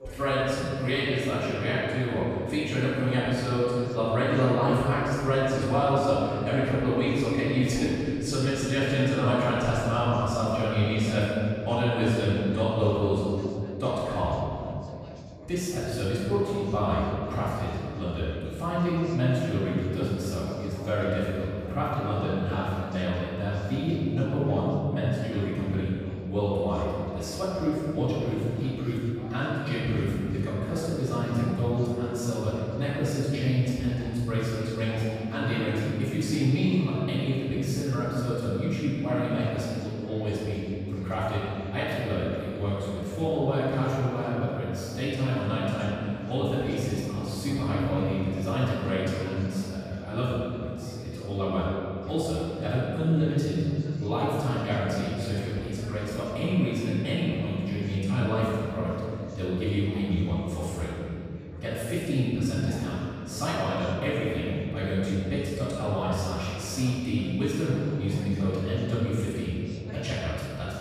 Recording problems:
room echo; strong; dies away in 2.9 s
off-mic speech; far
background chatter; noticeable; throughout; 4 voices, 20 dB below the speech

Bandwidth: 14.5 kHz